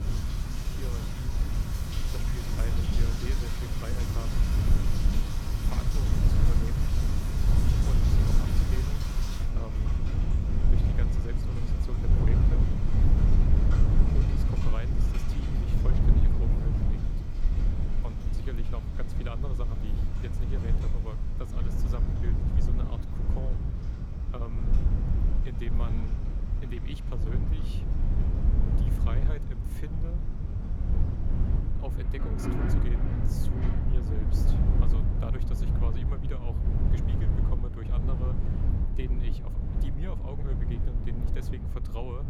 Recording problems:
rain or running water; very loud; throughout; 1 dB above the speech
wind noise on the microphone; heavy; 3 dB above the speech

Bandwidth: 17.5 kHz